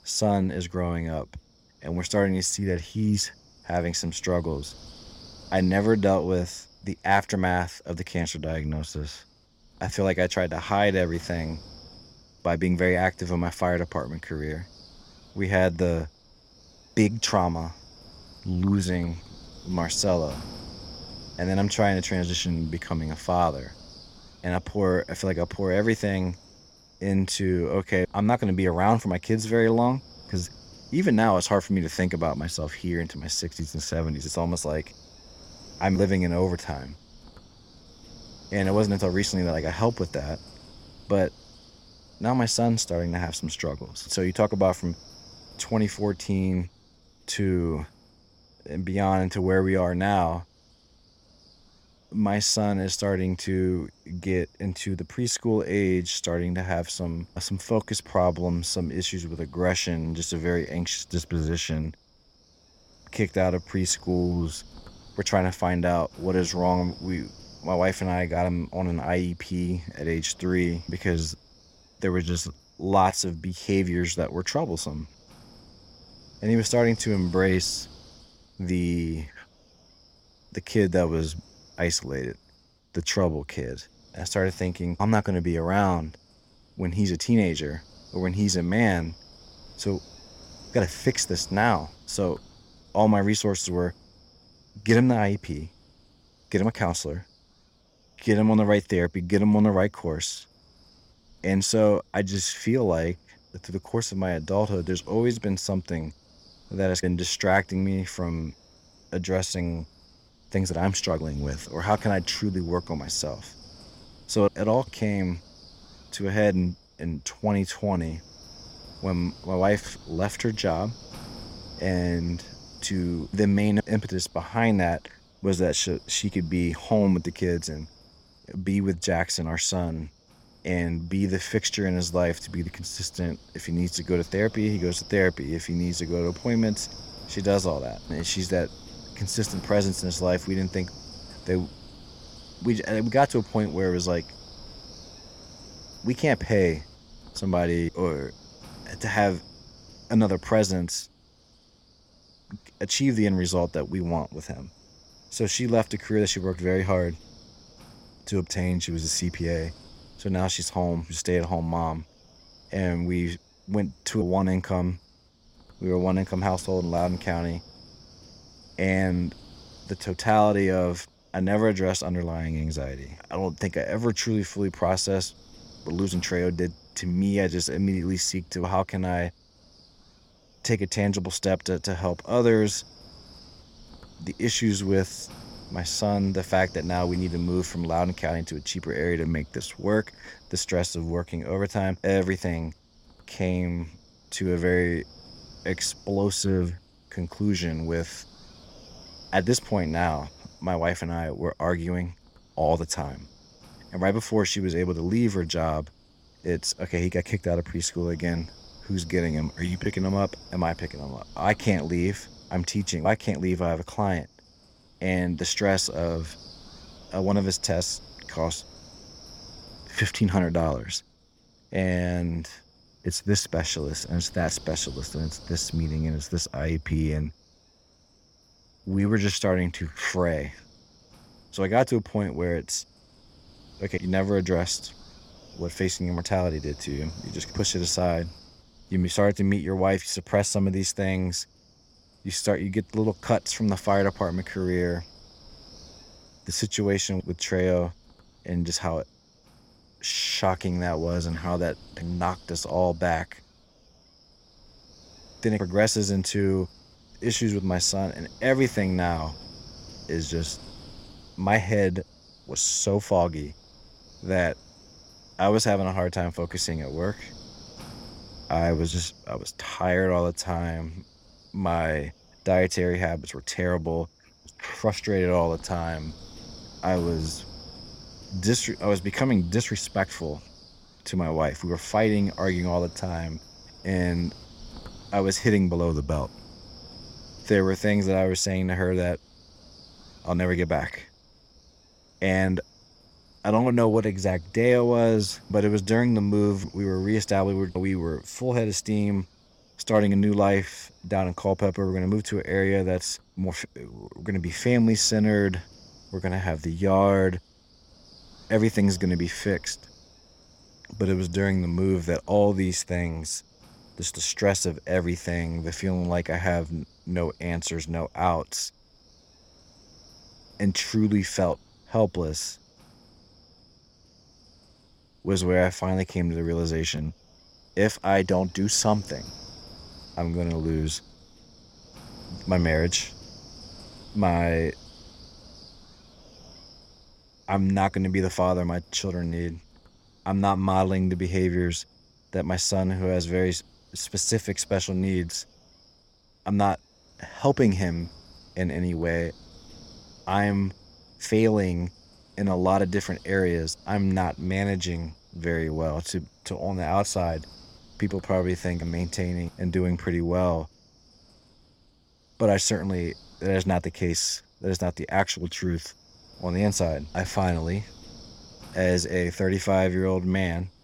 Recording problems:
wind noise on the microphone; occasional gusts; 20 dB below the speech

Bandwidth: 16.5 kHz